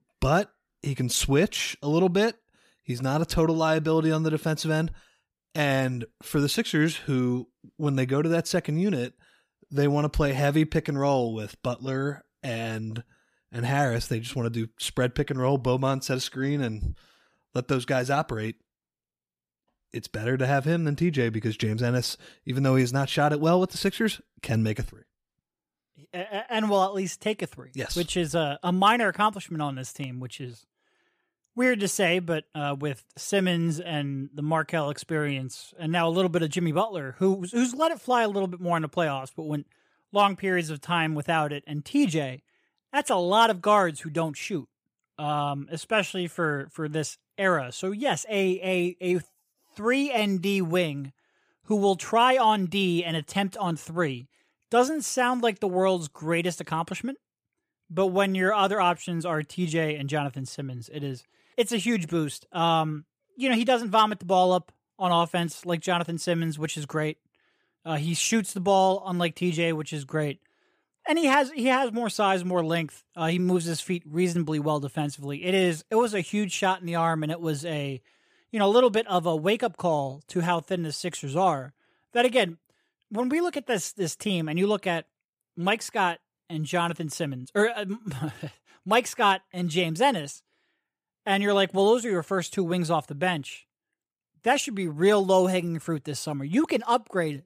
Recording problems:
none

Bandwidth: 15 kHz